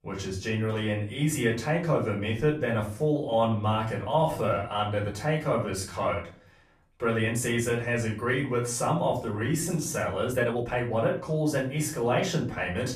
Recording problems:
off-mic speech; far
room echo; slight; dies away in 0.3 s
uneven, jittery; strongly; from 3 to 11 s

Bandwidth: 14.5 kHz